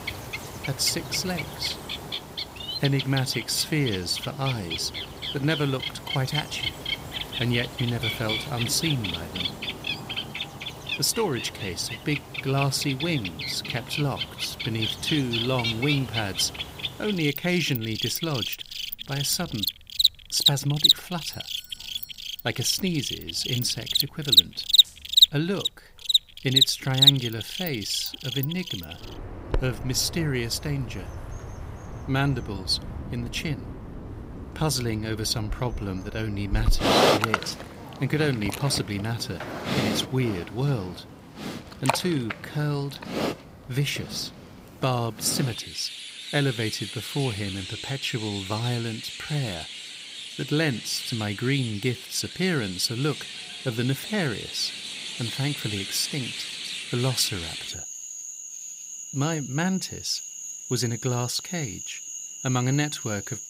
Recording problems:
animal sounds; very loud; throughout; as loud as the speech
doorbell; faint; from 21 to 23 s; peak 15 dB below the speech

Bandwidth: 15.5 kHz